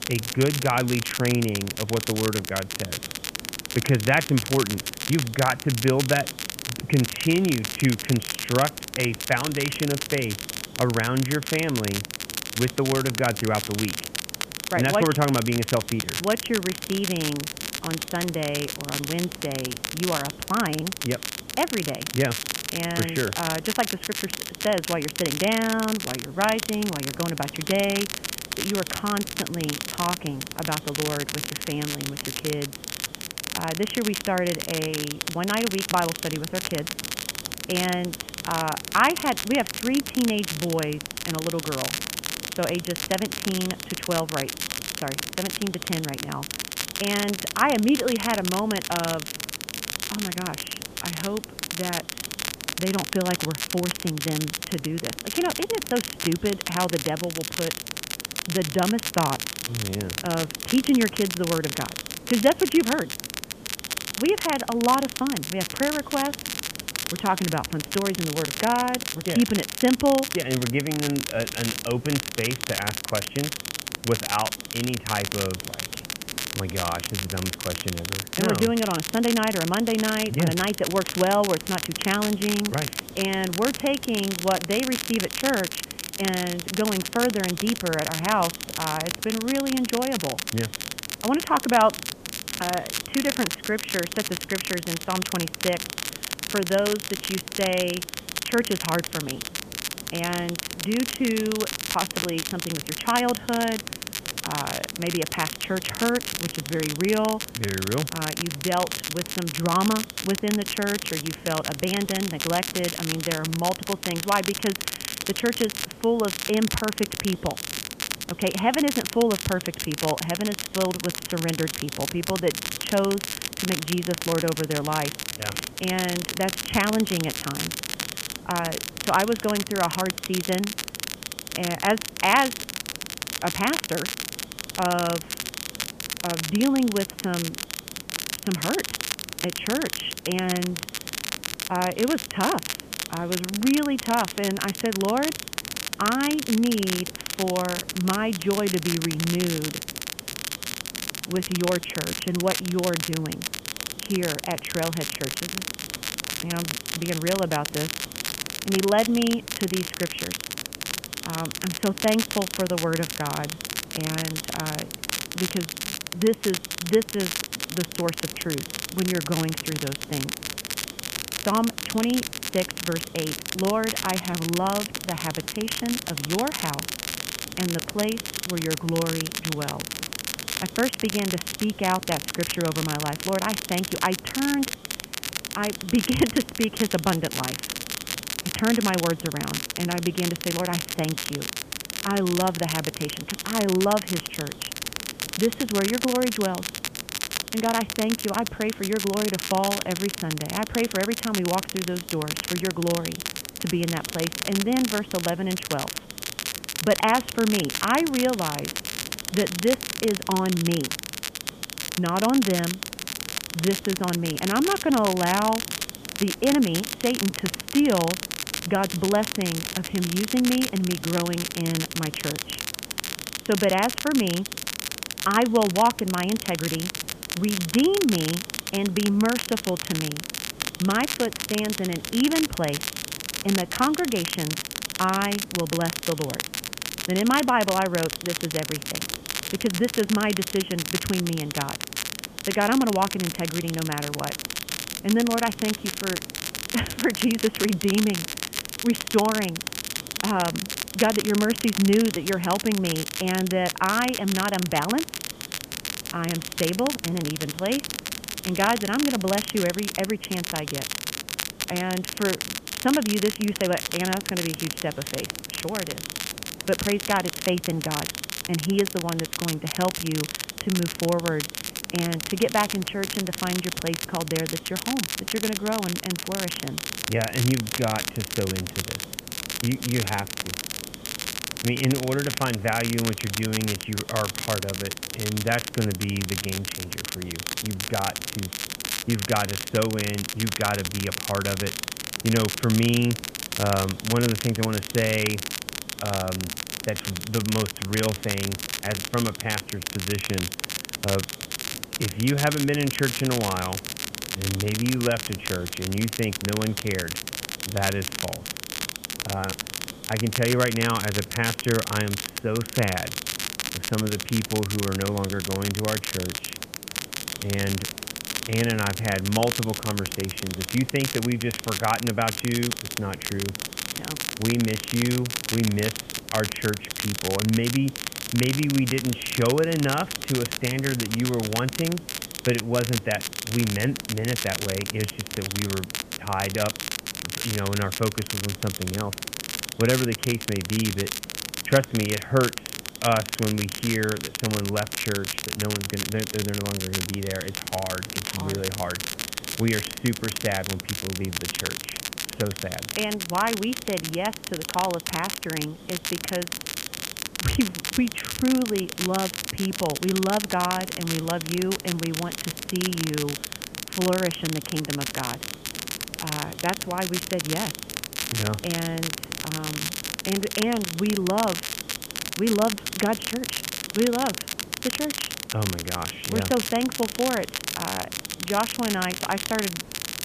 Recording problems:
high frequencies cut off; severe; nothing above 3.5 kHz
crackle, like an old record; loud; 4 dB below the speech
hiss; noticeable; throughout; 20 dB below the speech

